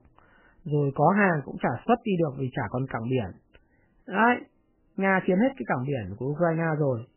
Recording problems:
garbled, watery; badly; nothing above 3 kHz

